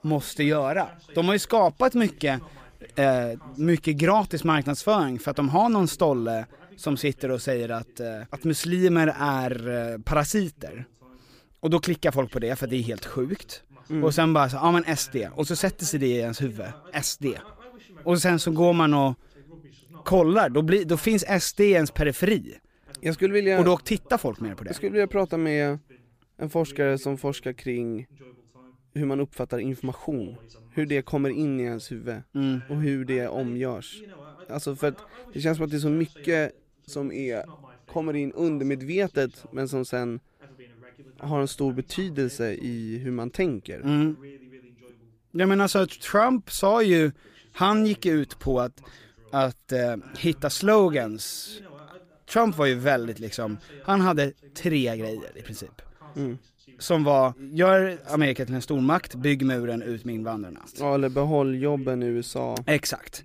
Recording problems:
voice in the background; faint; throughout; 25 dB below the speech

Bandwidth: 15 kHz